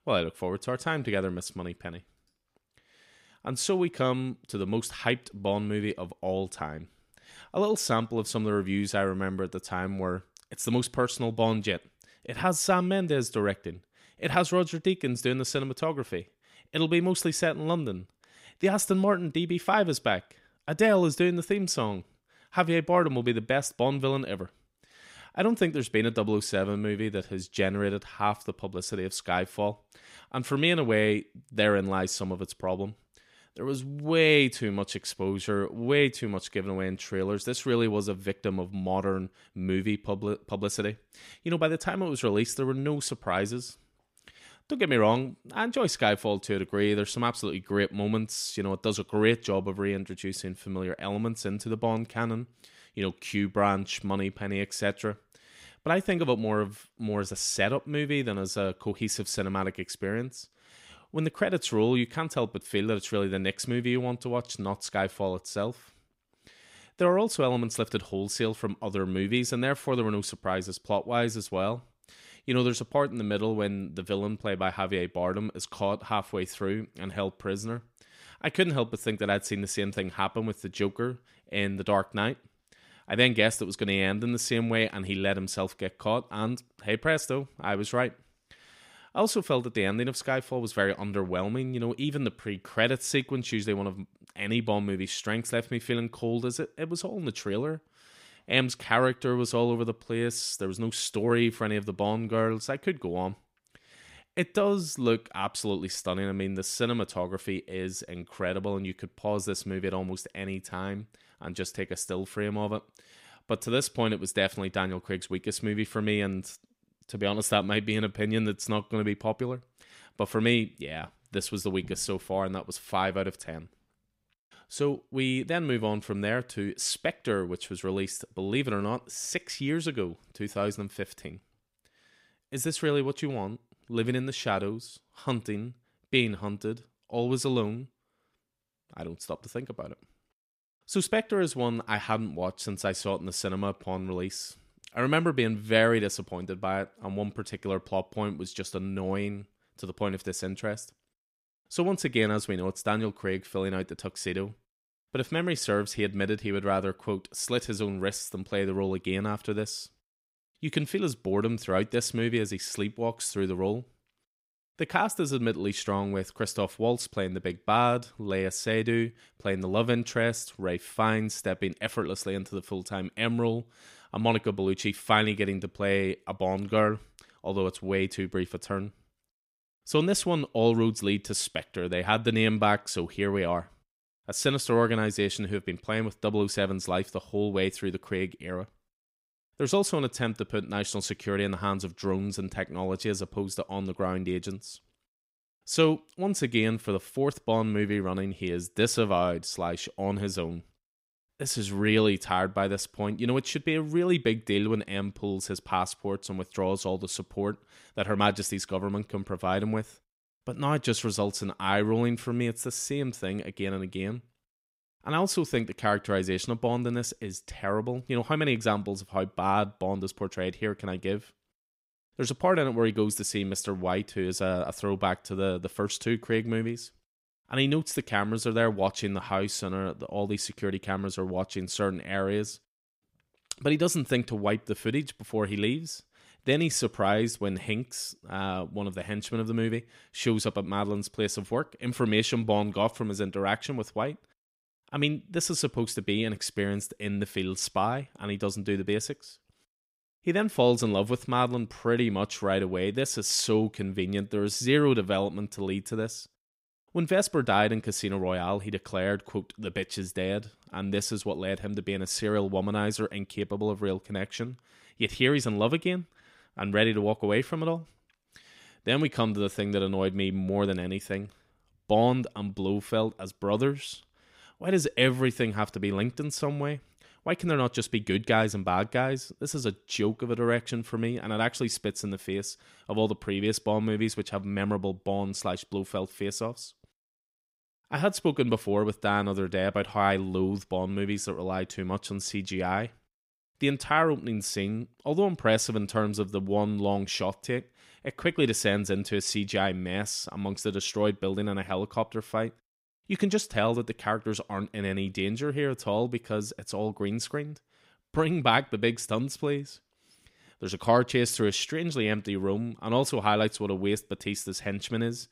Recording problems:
none

